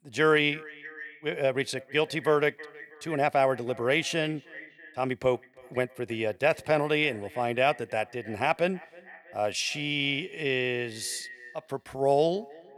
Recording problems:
echo of what is said; faint; throughout; 320 ms later, 20 dB below the speech

